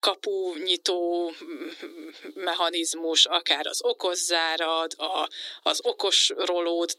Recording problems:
thin; very; fading below 300 Hz

